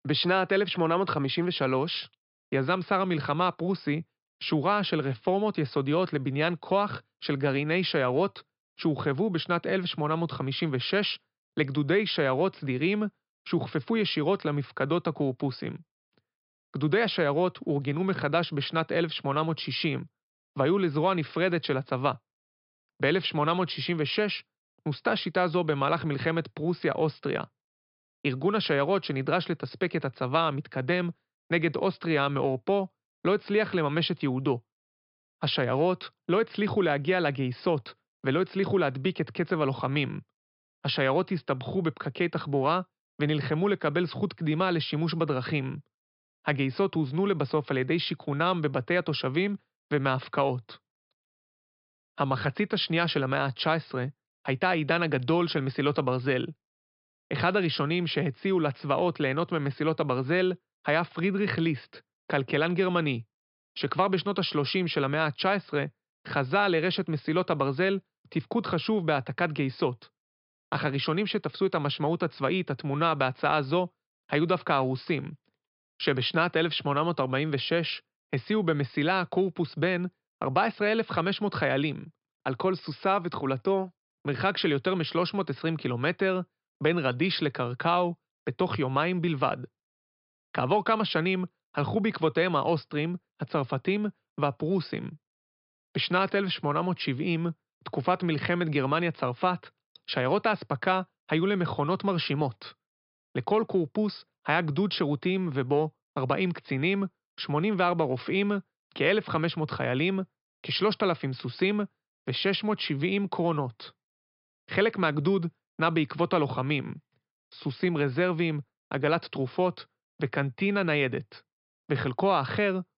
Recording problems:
high frequencies cut off; noticeable; nothing above 5.5 kHz

